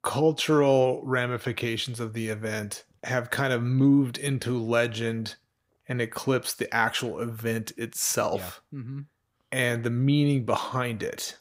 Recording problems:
none

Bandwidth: 15.5 kHz